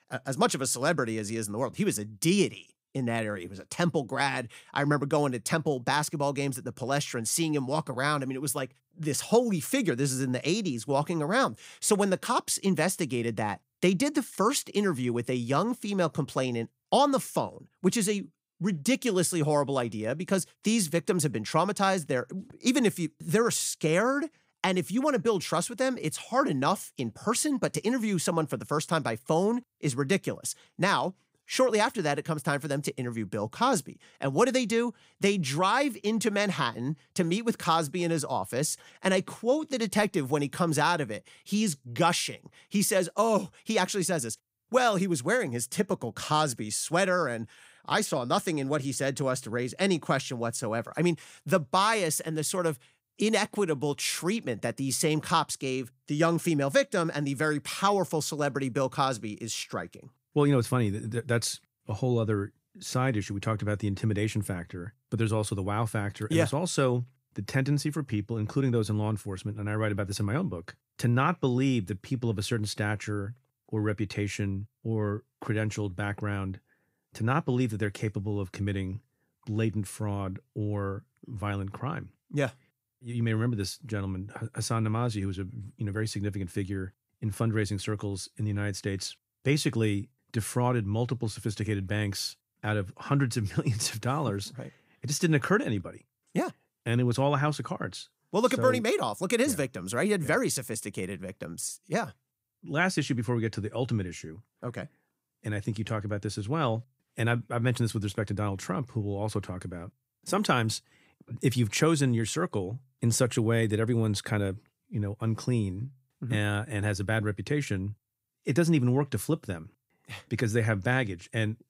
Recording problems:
none

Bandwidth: 15.5 kHz